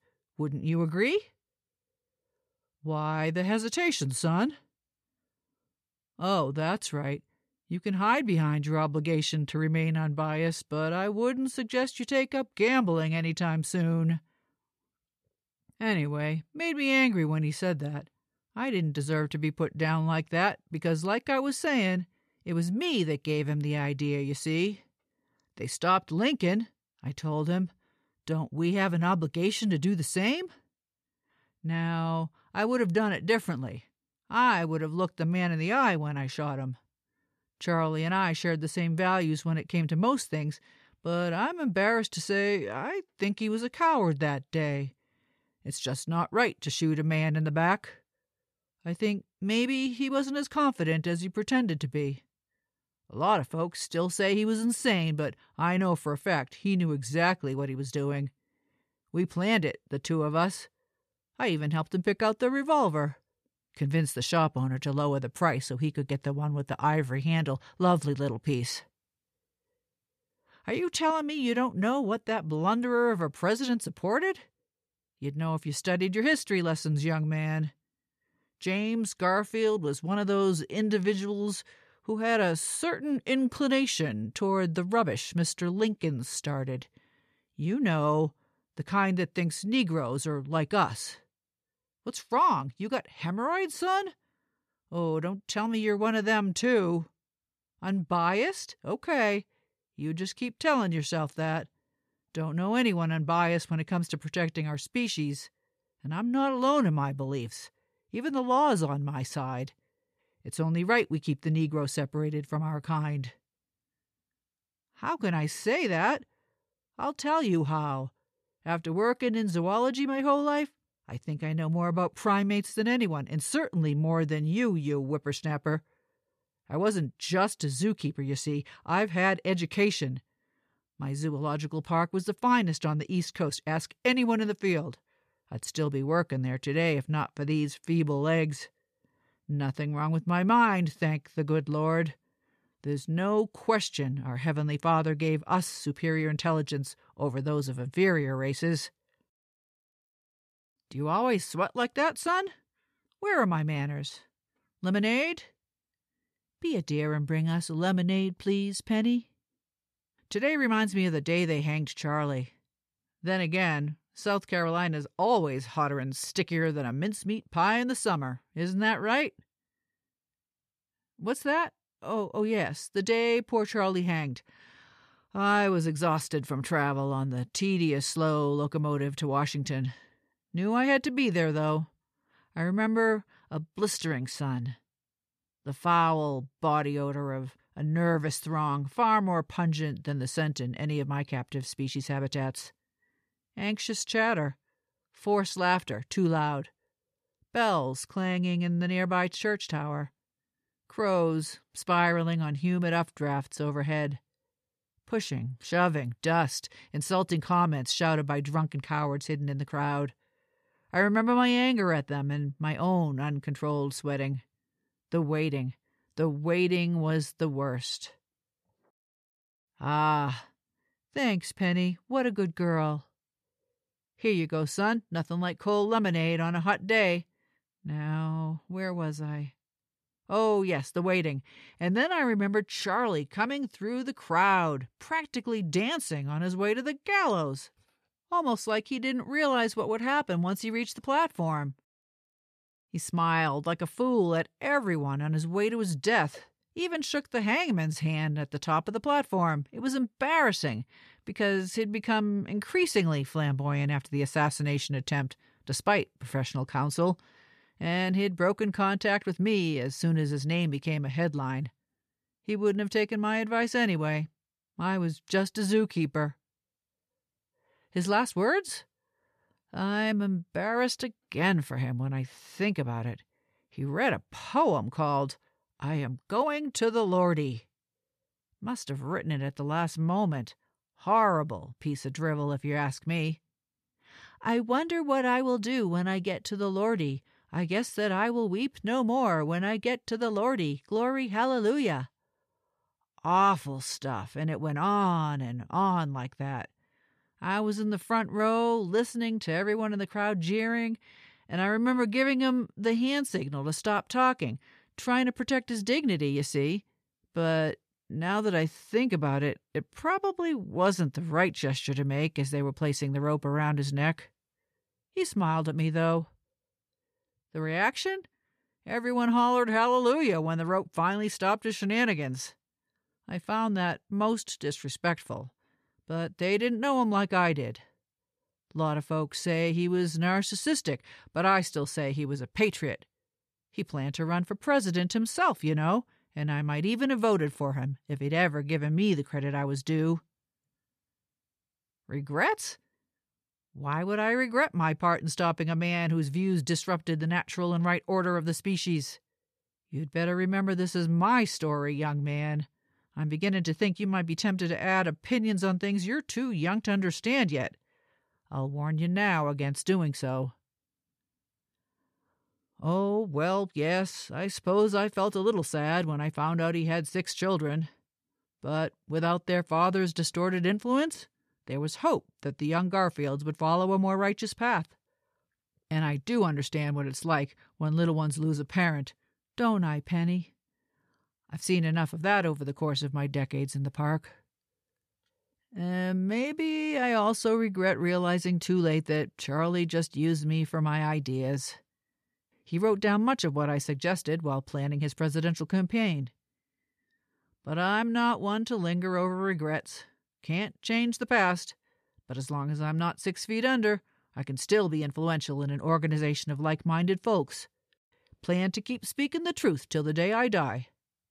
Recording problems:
none

